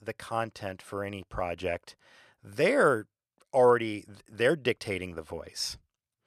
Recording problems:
none

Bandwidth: 13.5 kHz